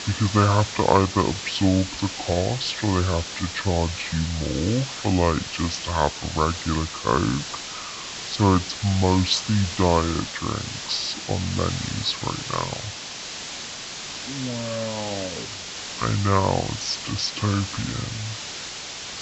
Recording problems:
wrong speed and pitch; too slow and too low; 0.6 times normal speed
high frequencies cut off; noticeable; nothing above 8 kHz
hiss; loud; throughout; 7 dB below the speech

